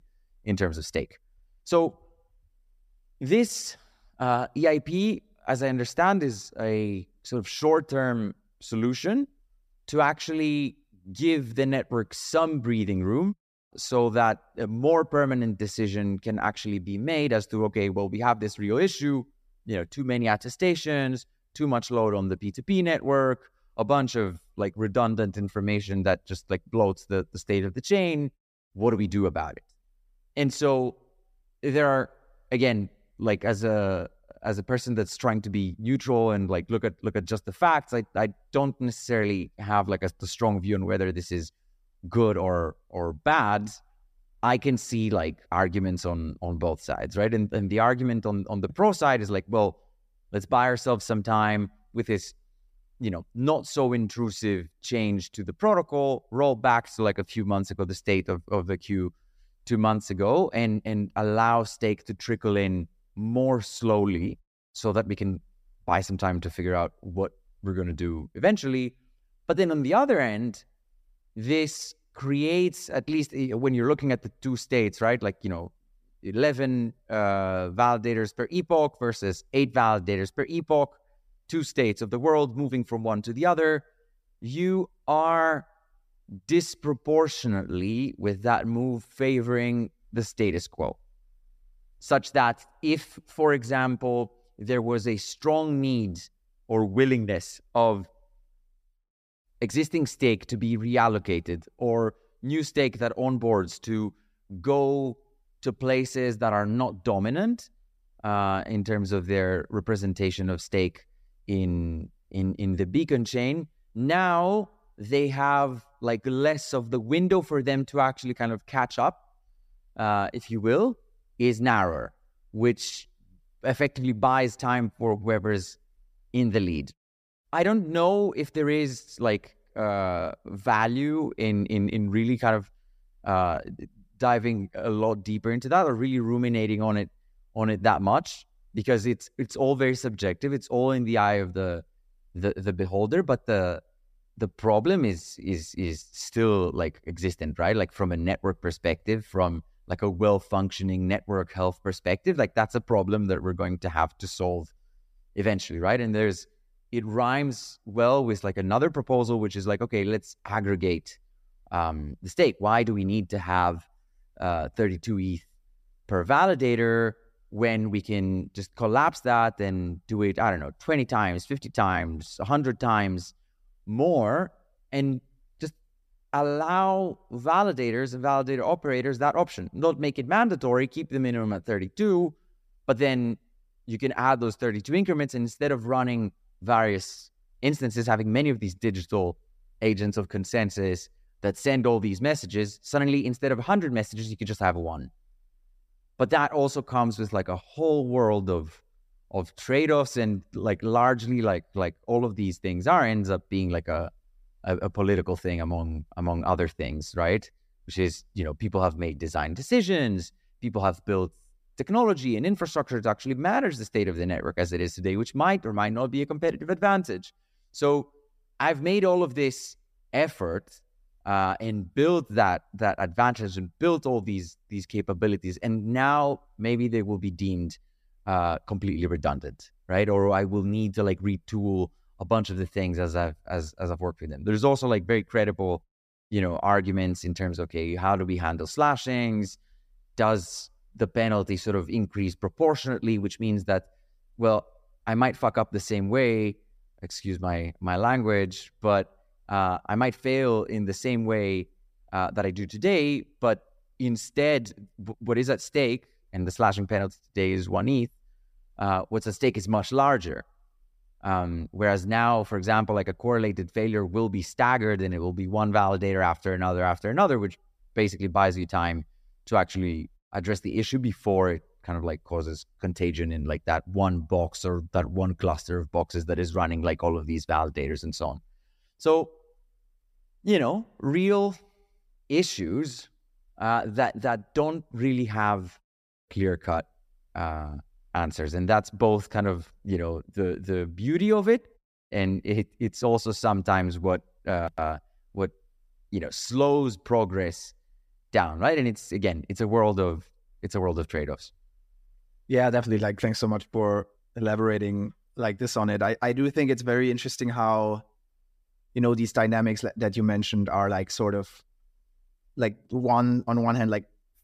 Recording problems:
none

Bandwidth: 15 kHz